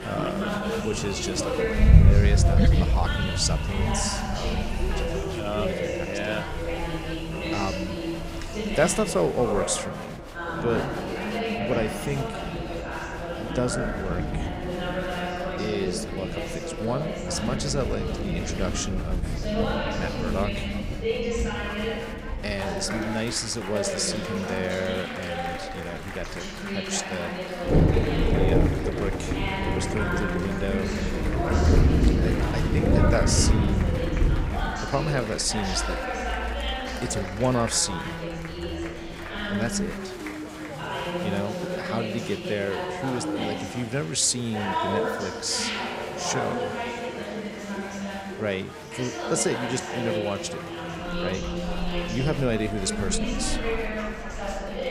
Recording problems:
rain or running water; very loud; throughout; 1 dB above the speech
chatter from many people; loud; throughout; 2 dB below the speech

